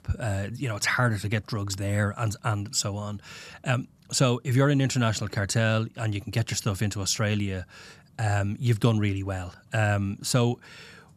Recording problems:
none

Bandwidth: 13.5 kHz